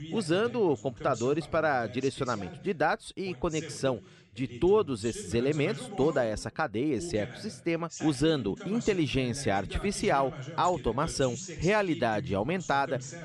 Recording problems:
voice in the background; noticeable; throughout; 15 dB below the speech

